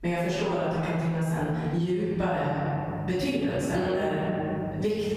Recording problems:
room echo; strong; dies away in 1.7 s
off-mic speech; far
squashed, flat; somewhat
electrical hum; faint; from 2 s on; 50 Hz, 25 dB below the speech

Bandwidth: 14.5 kHz